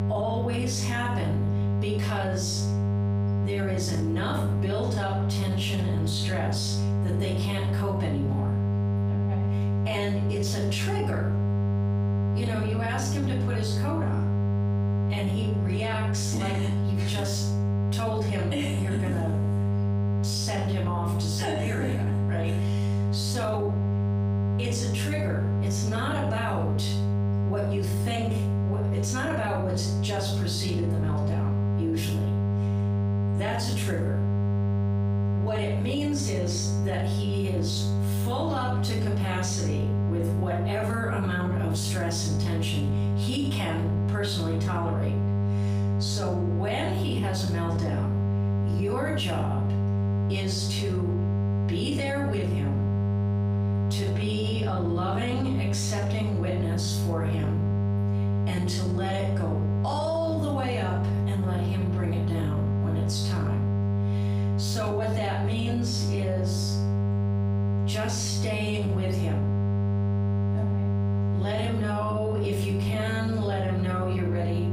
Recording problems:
off-mic speech; far
room echo; noticeable; dies away in 0.5 s
squashed, flat; somewhat
electrical hum; loud; throughout; 50 Hz, 5 dB below the speech

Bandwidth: 15.5 kHz